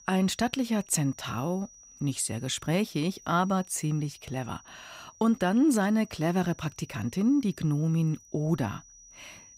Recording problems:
high-pitched whine; faint; throughout; 6 kHz, 25 dB below the speech

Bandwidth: 15.5 kHz